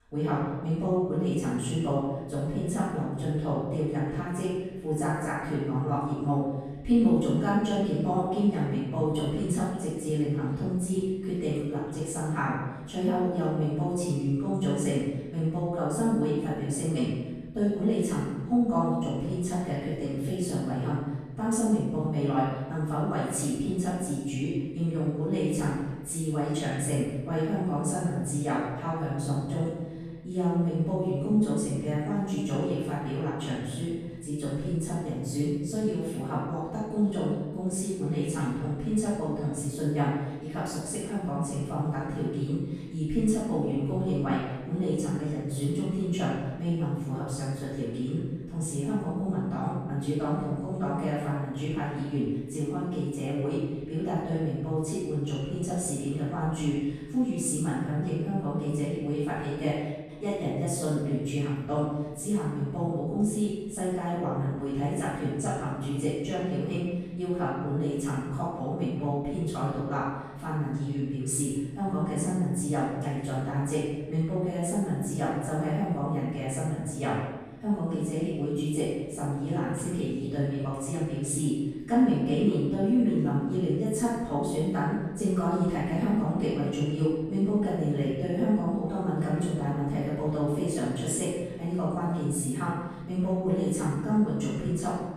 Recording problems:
room echo; strong; dies away in 1.2 s
off-mic speech; far

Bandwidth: 14.5 kHz